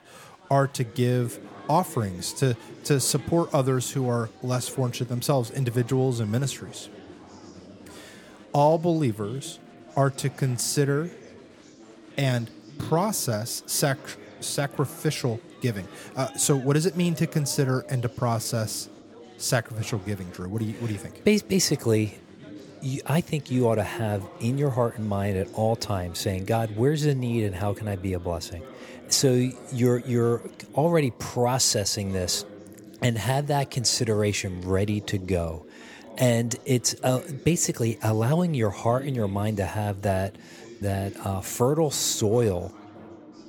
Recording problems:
chatter from many people; noticeable; throughout; 20 dB below the speech

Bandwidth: 17 kHz